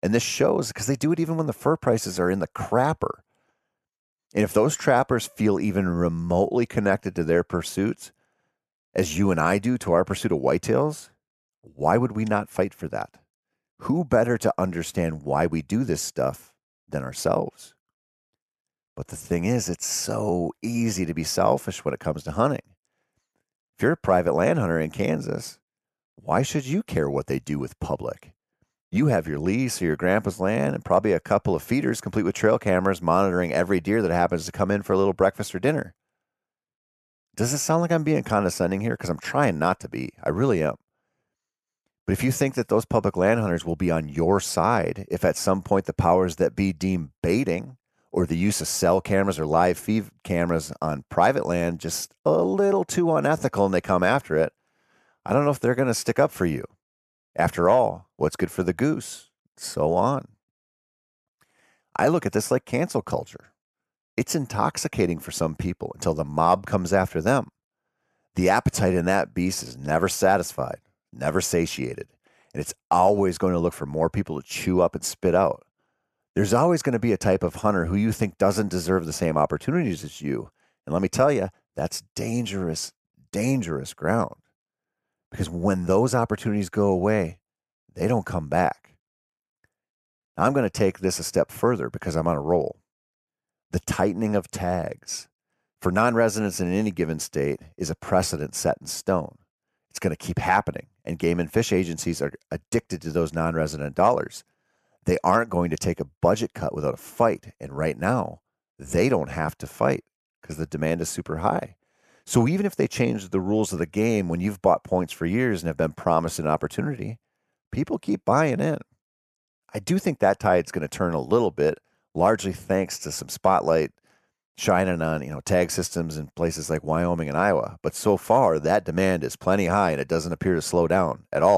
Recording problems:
abrupt cut into speech; at the end

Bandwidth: 13.5 kHz